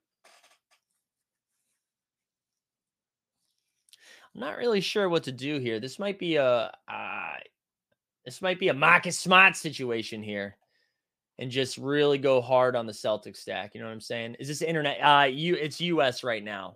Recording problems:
none

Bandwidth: 15 kHz